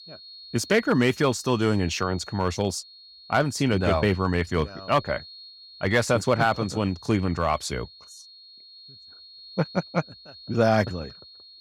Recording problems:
high-pitched whine; noticeable; throughout; 4.5 kHz, 20 dB below the speech

